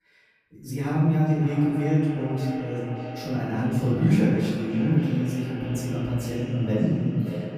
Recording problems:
off-mic speech; far
echo of what is said; noticeable; throughout; 580 ms later, 15 dB below the speech
room echo; noticeable; dies away in 1.4 s

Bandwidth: 14.5 kHz